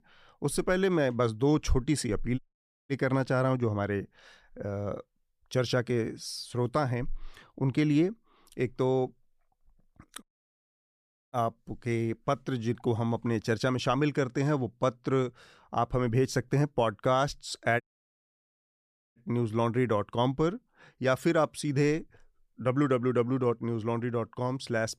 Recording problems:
audio cutting out; at 2.5 s for 0.5 s, at 10 s for 1 s and at 18 s for 1.5 s

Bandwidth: 15 kHz